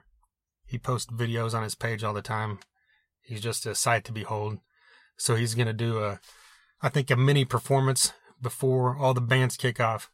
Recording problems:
none

